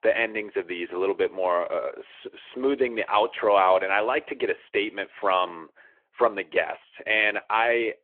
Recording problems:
phone-call audio

